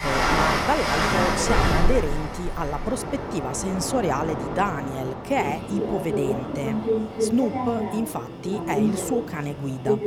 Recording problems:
train or aircraft noise; very loud; throughout; 1 dB above the speech

